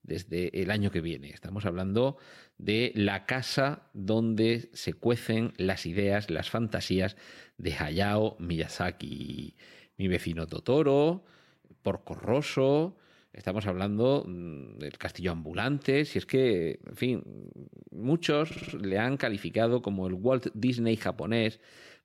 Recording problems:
audio stuttering; at 9 s and at 18 s

